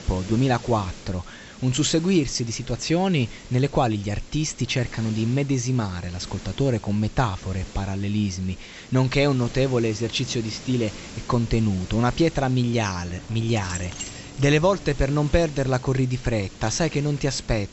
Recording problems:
high frequencies cut off; noticeable; nothing above 7.5 kHz
hiss; noticeable; throughout; 20 dB below the speech
jangling keys; noticeable; from 13 to 15 s; peak 8 dB below the speech

